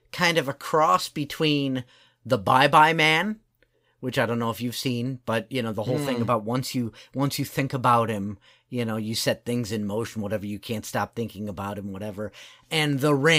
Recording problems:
abrupt cut into speech; at the end

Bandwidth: 15.5 kHz